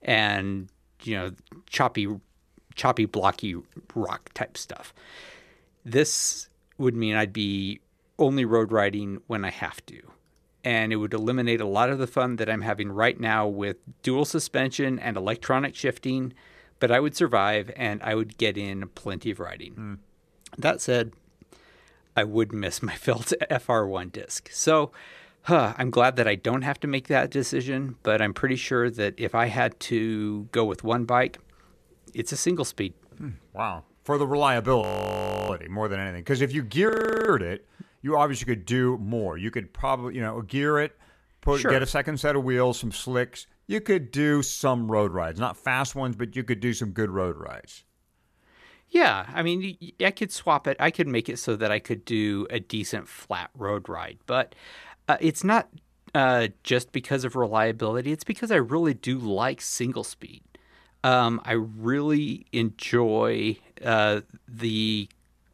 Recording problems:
audio freezing; at 35 s for 0.5 s and at 37 s

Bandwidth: 14 kHz